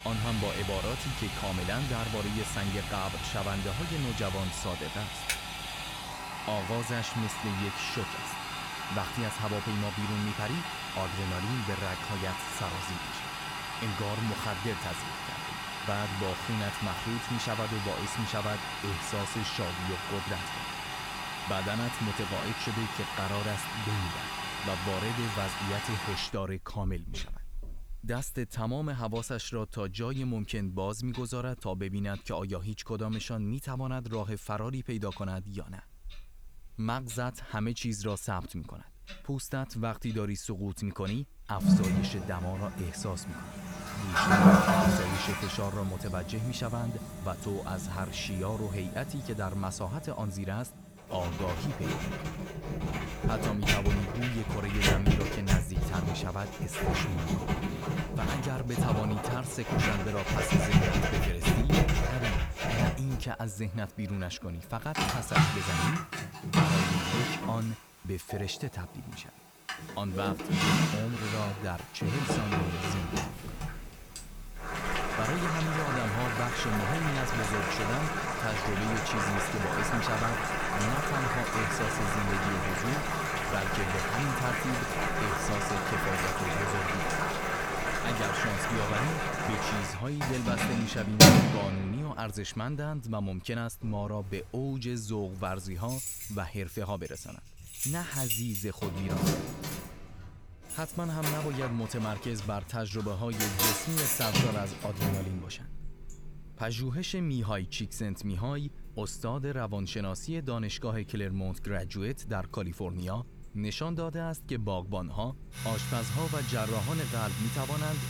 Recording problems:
household noises; very loud; throughout; 4 dB above the speech
keyboard typing; loud; at 5.5 s; peak 1 dB above the speech
door banging; faint; from 1:13 to 1:15; peak 10 dB below the speech

